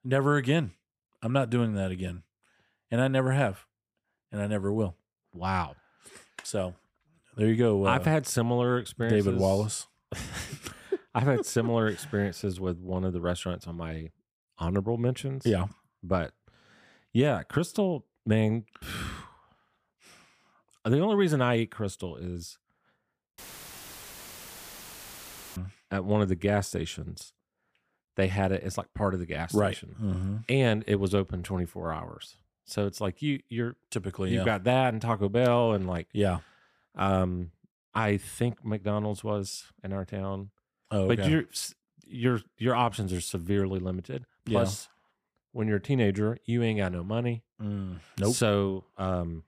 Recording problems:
audio cutting out; filled with static; at 23 s for 2 s

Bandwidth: 15 kHz